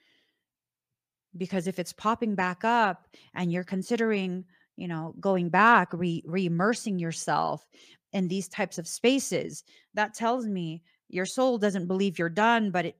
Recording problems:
none

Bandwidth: 15 kHz